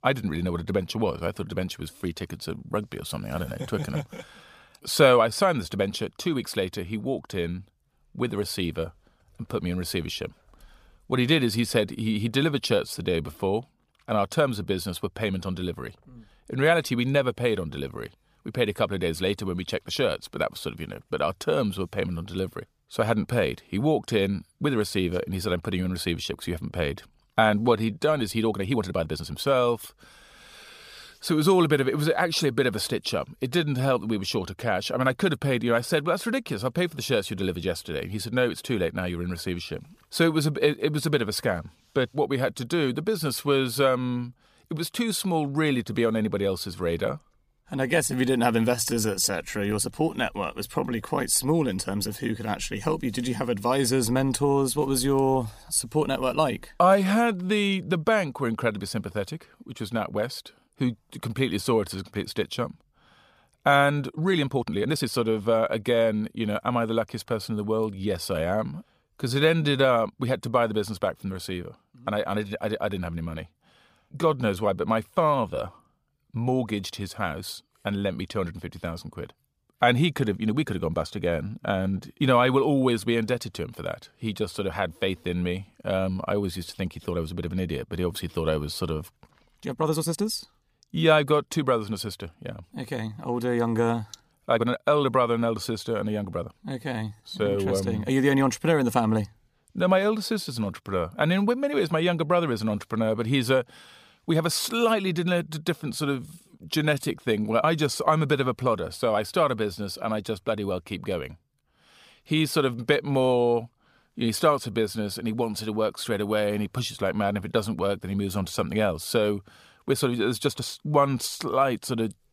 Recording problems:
uneven, jittery; strongly; from 4.5 s to 2:01

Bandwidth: 15 kHz